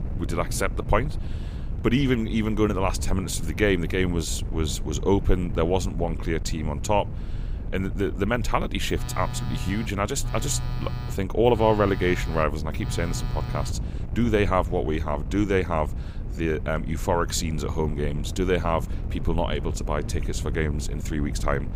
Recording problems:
wind noise on the microphone; occasional gusts; 20 dB below the speech
phone ringing; noticeable; from 9 to 14 s; peak 8 dB below the speech

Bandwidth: 15.5 kHz